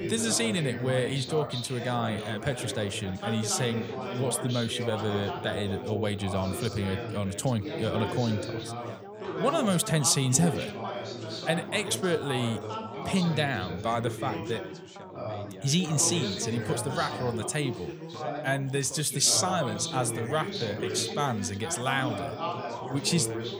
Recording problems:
background chatter; loud; throughout; 4 voices, 7 dB below the speech

